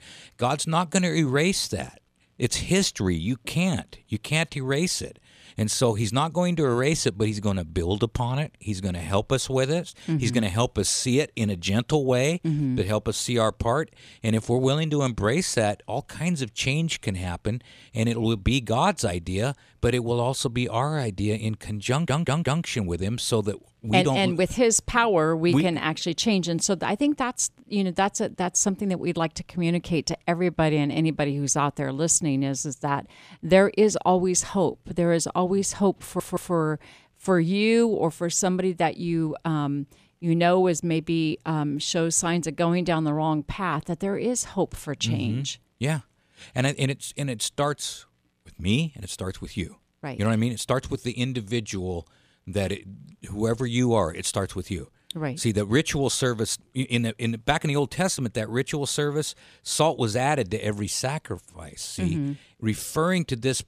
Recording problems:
audio stuttering; at 22 s and at 36 s

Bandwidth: 14.5 kHz